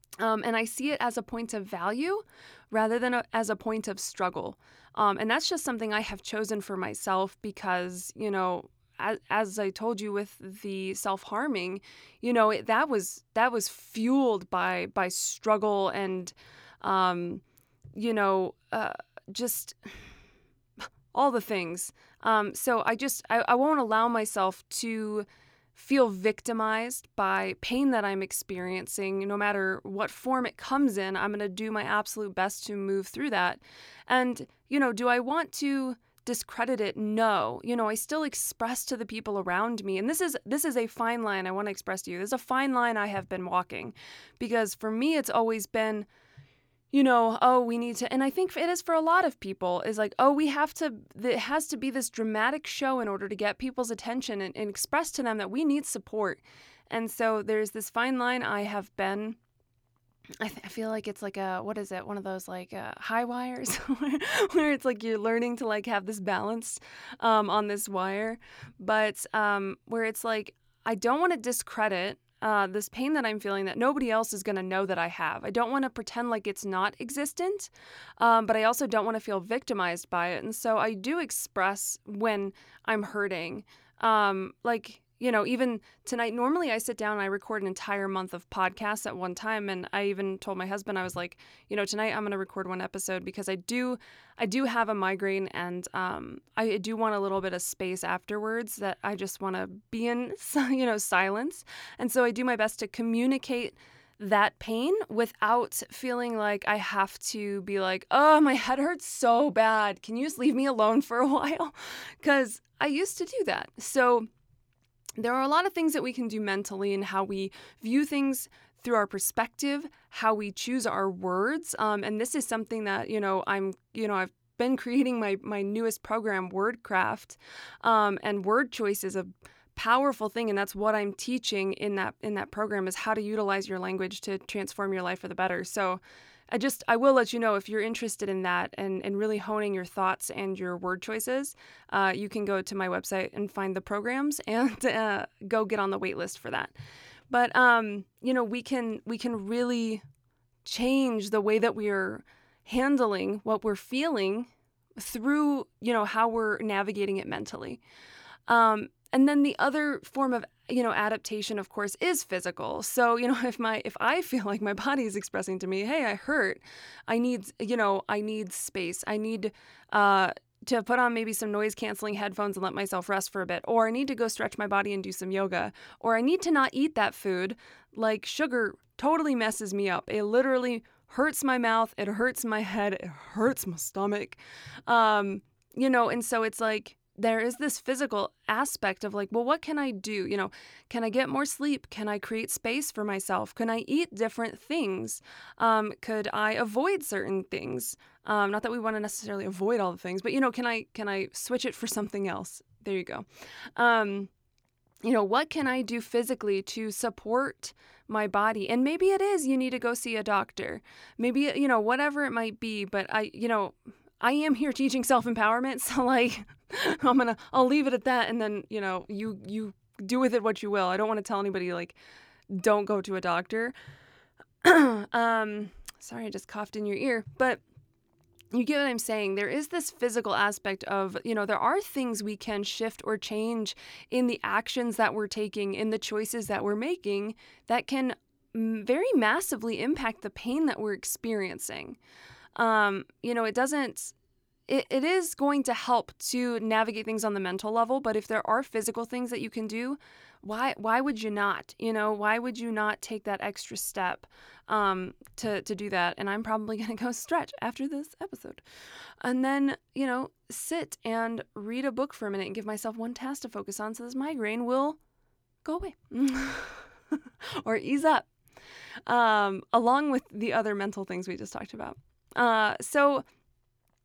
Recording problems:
none

